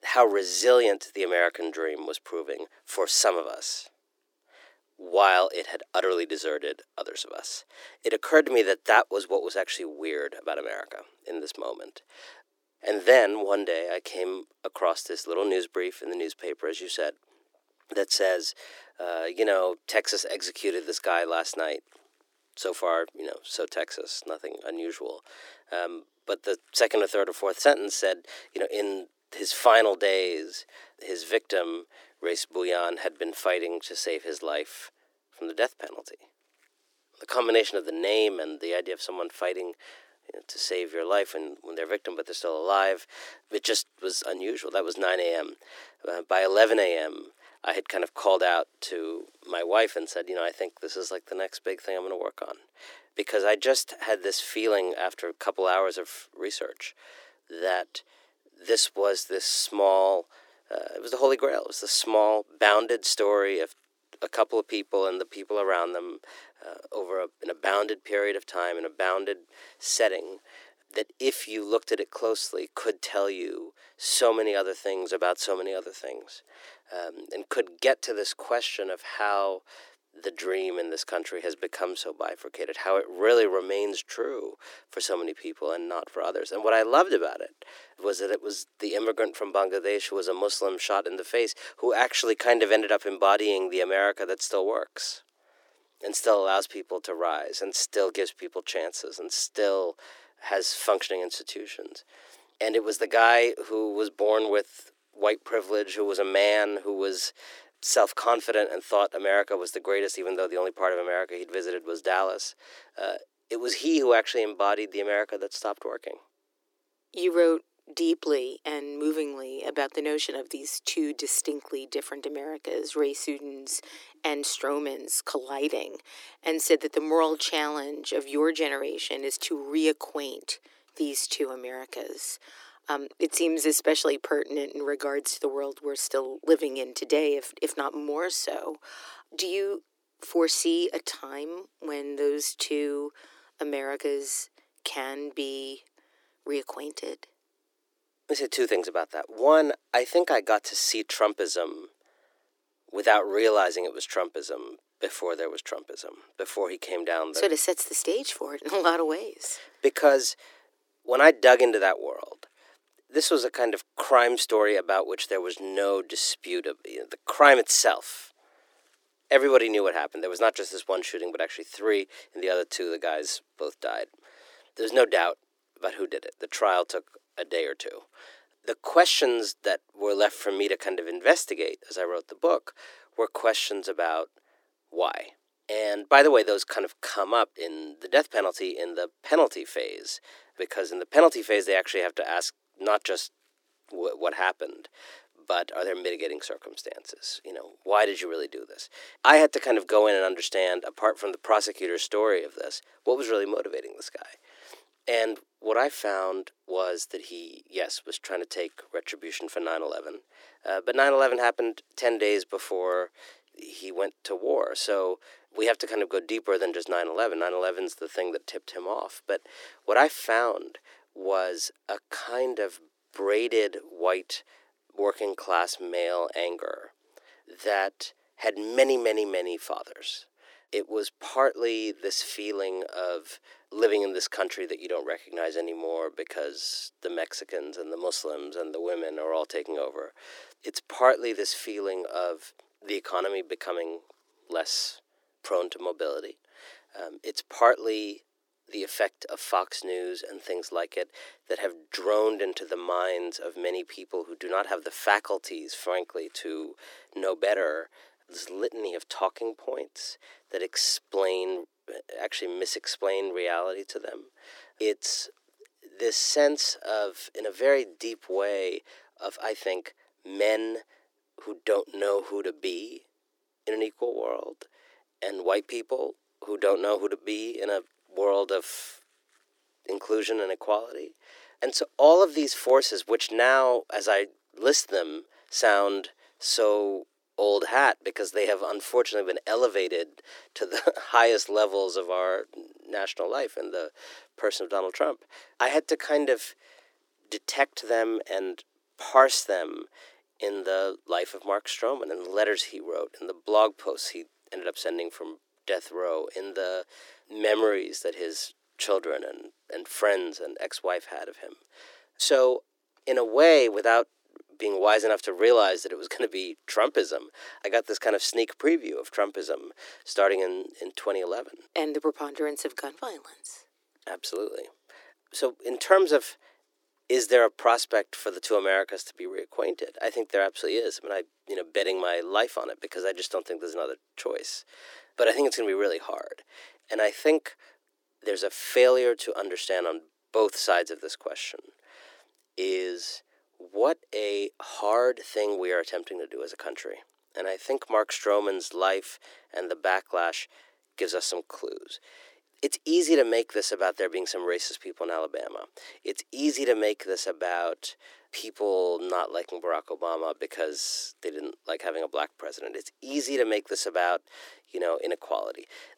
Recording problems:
thin; very; fading below 300 Hz

